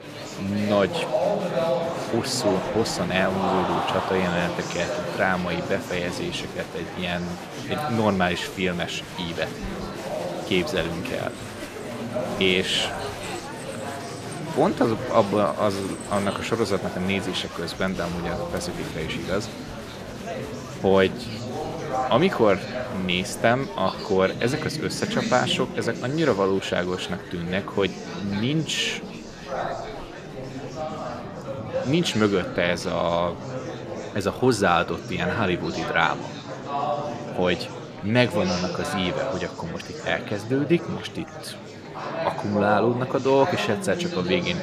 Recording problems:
murmuring crowd; loud; throughout; 6 dB below the speech

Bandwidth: 14.5 kHz